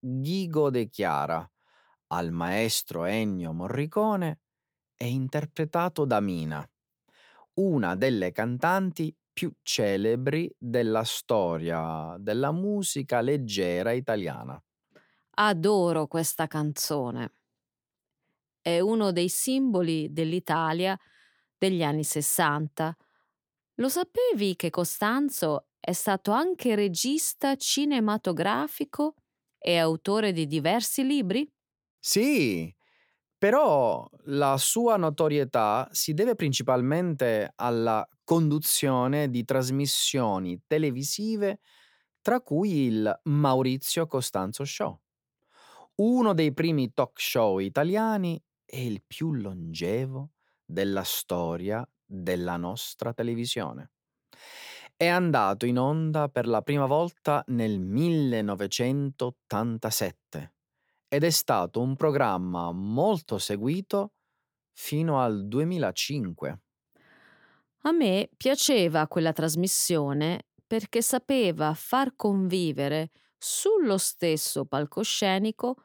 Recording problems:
none

